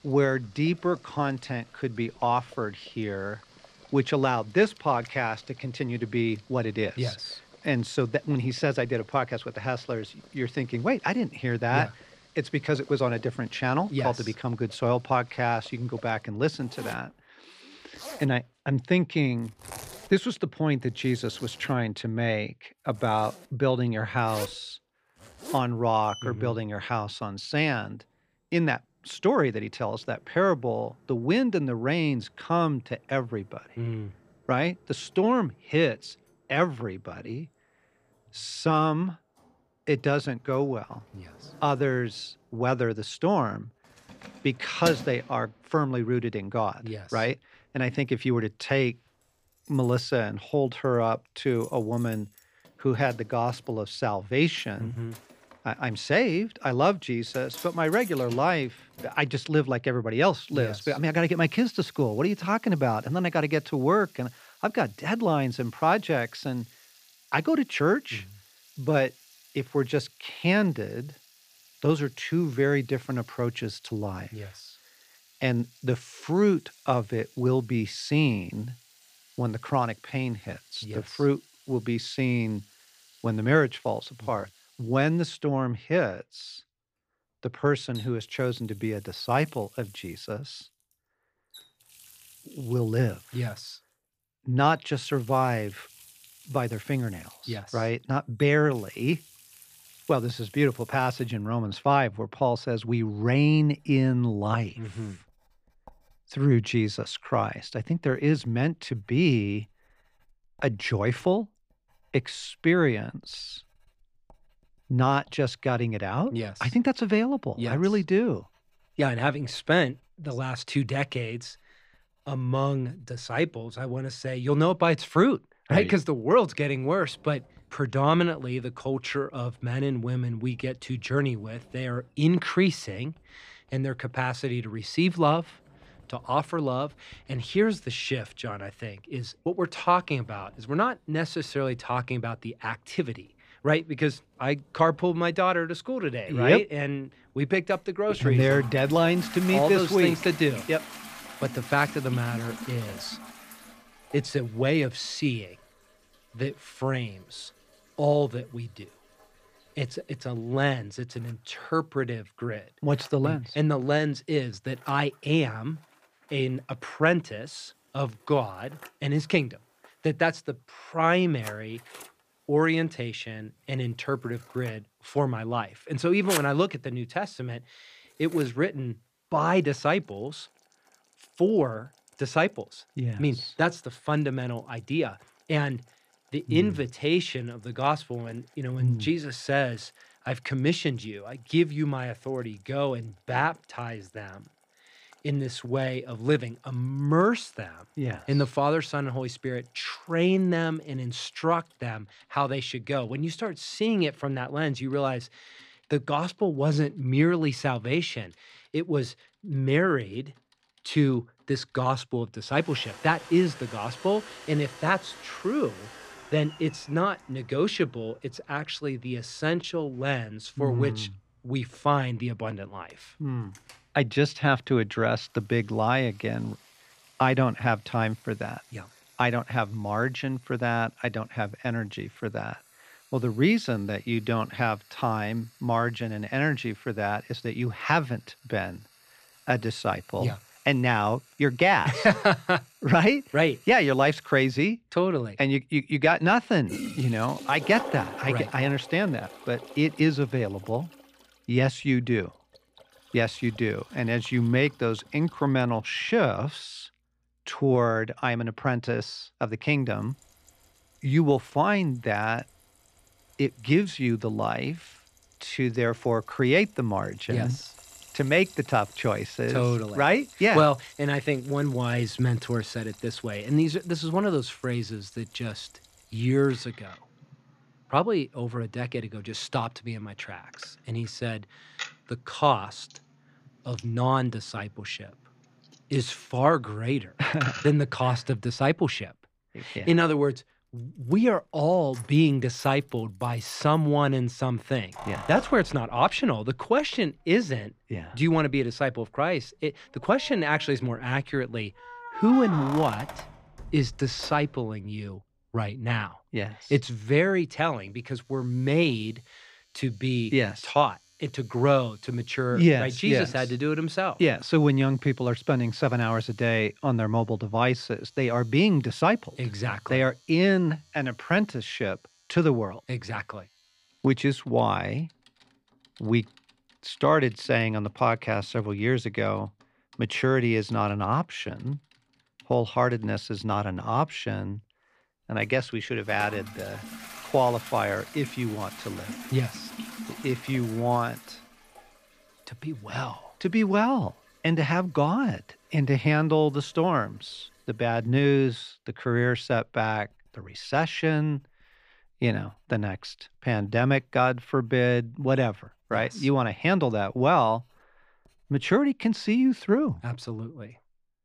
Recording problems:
household noises; noticeable; throughout; 20 dB below the speech

